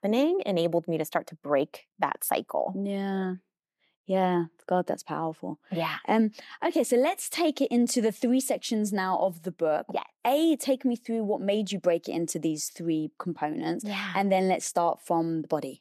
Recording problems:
none

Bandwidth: 13.5 kHz